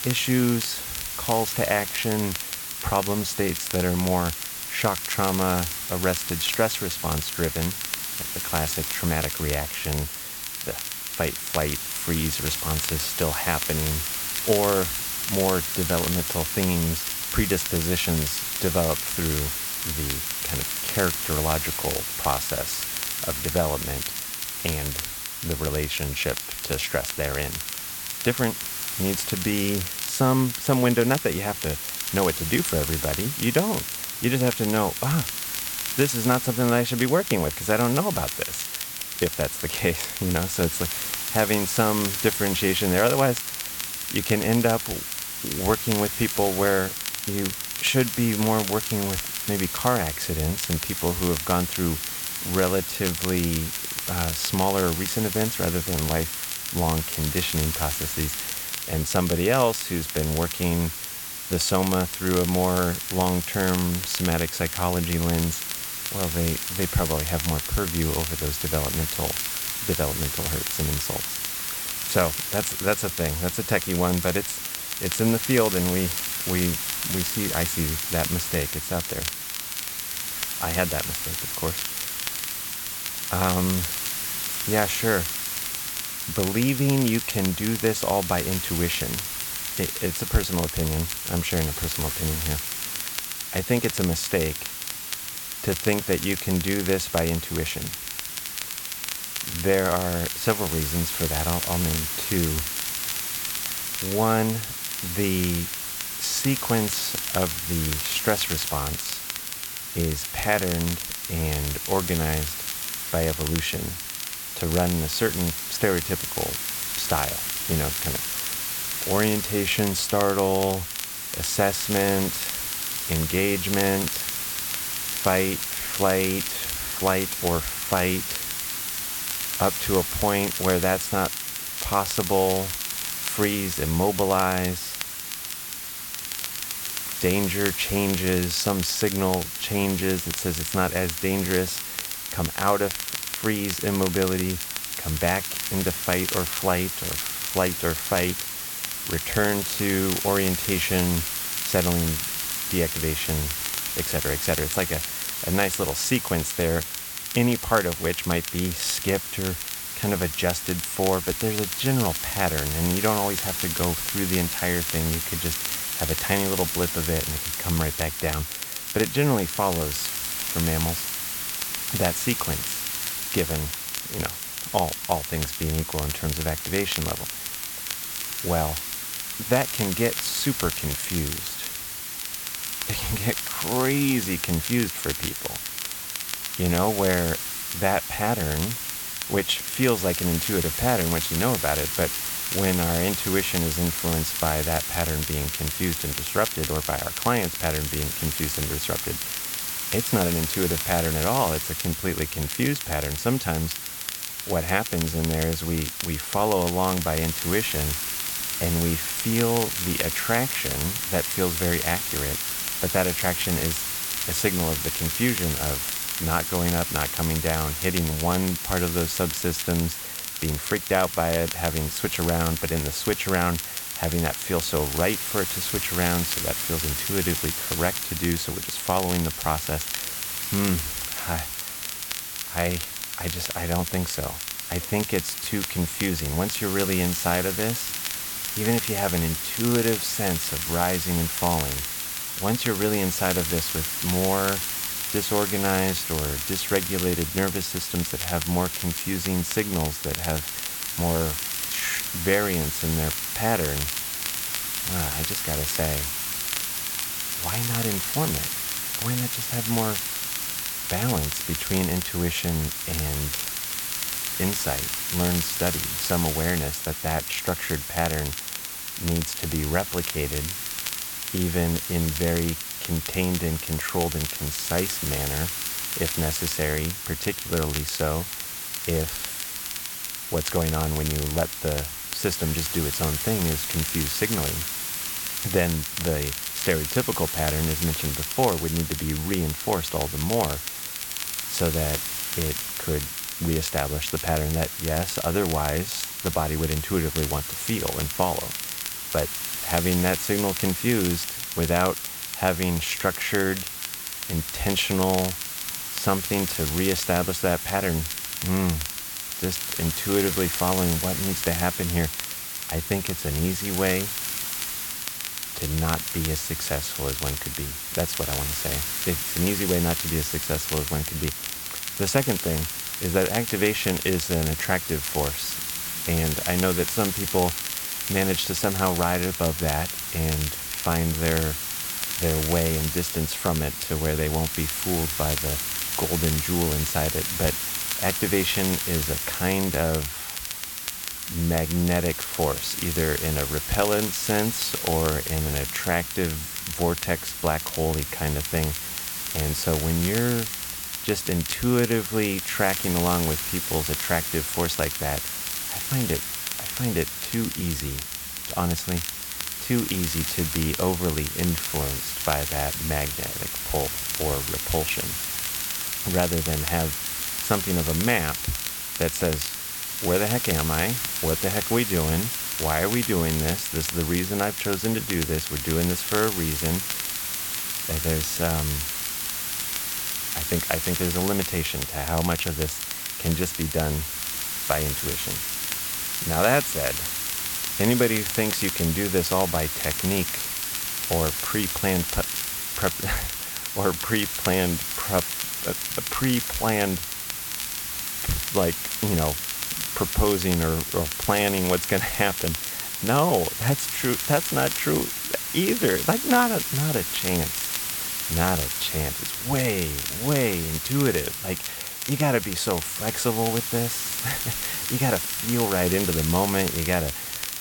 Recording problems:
hiss; loud; throughout; 2 dB below the speech
crackle, like an old record; loud; 8 dB below the speech

